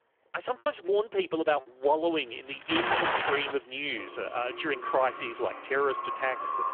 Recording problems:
phone-call audio; poor line; nothing above 3.5 kHz
echo of what is said; strong; from 4 s on; 500 ms later, 7 dB below the speech
traffic noise; very loud; throughout; 2 dB above the speech
choppy; very; from 0.5 to 2 s; 5% of the speech affected

